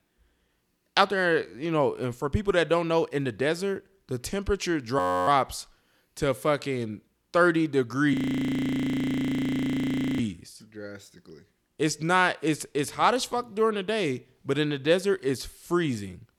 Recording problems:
audio freezing; at 5 s and at 8 s for 2 s

